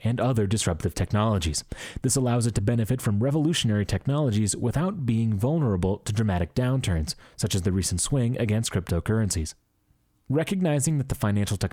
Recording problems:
squashed, flat; somewhat

